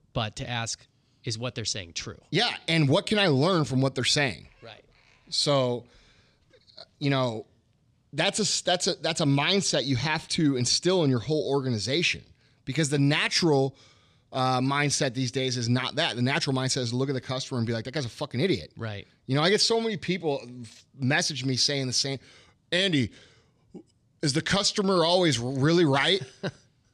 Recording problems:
none

